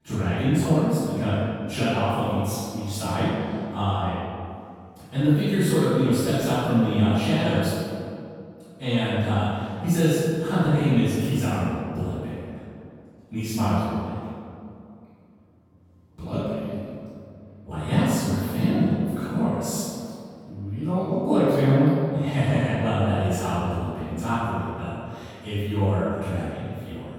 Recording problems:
room echo; strong; dies away in 2.2 s
off-mic speech; far

